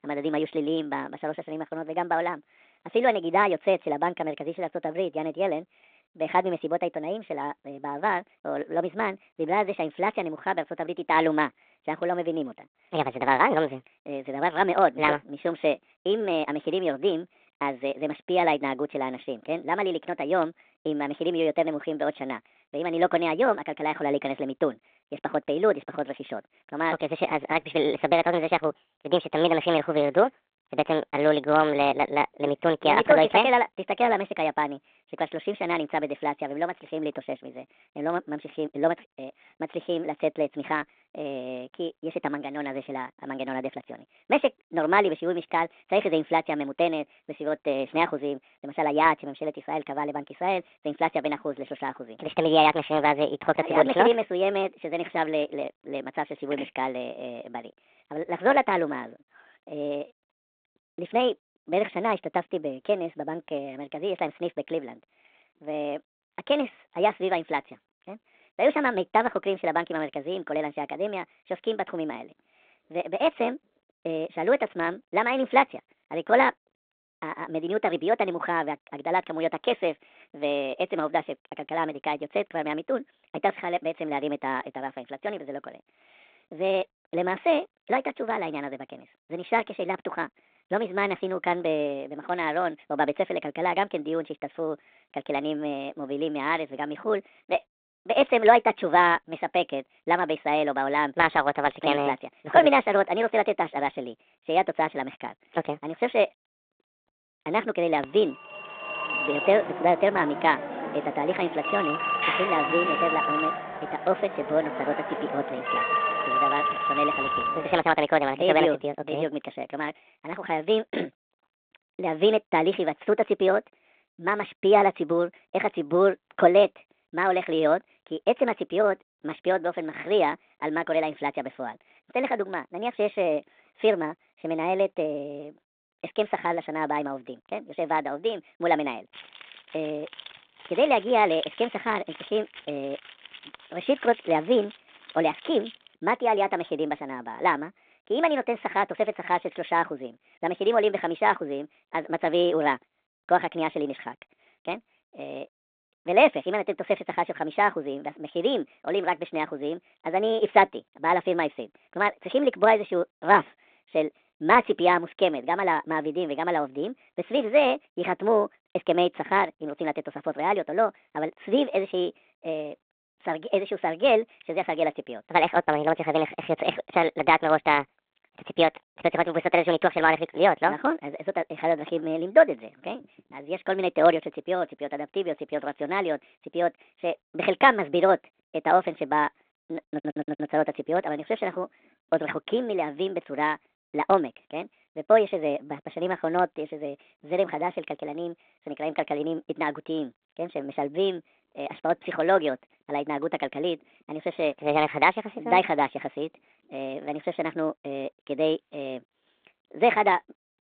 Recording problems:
wrong speed and pitch; too fast and too high; 1.5 times normal speed
phone-call audio; nothing above 3.5 kHz
phone ringing; loud; from 1:48 to 1:58; peak 3 dB above the speech
jangling keys; faint; from 2:19 to 2:26; peak 10 dB below the speech
audio stuttering; at 3:10

